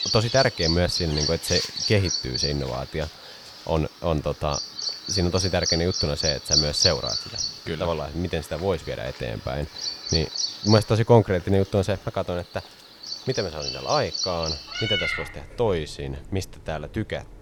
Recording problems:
animal sounds; very loud; throughout; as loud as the speech

